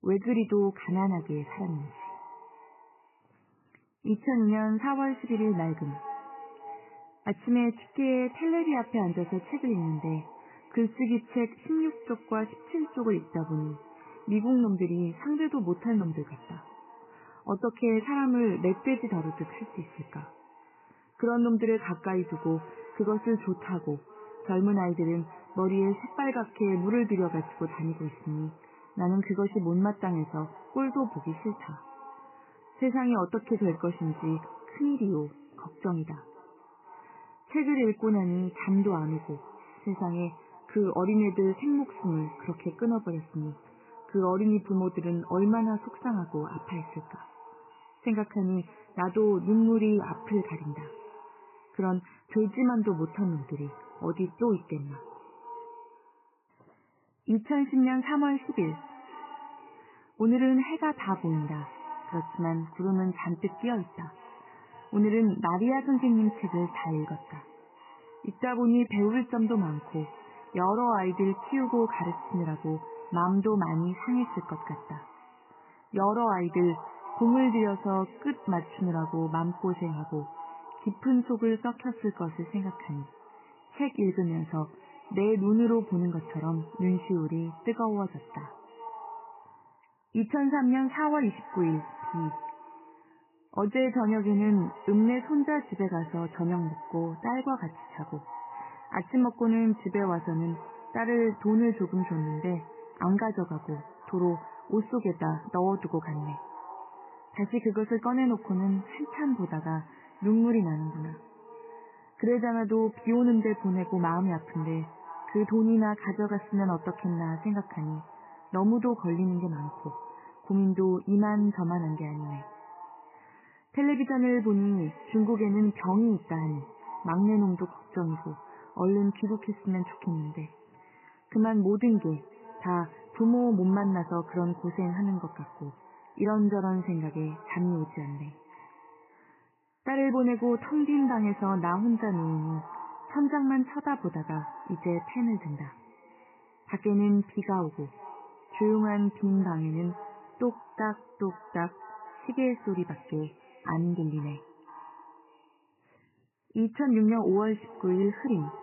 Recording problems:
garbled, watery; badly; nothing above 3 kHz
echo of what is said; noticeable; throughout; 500 ms later, 20 dB below the speech

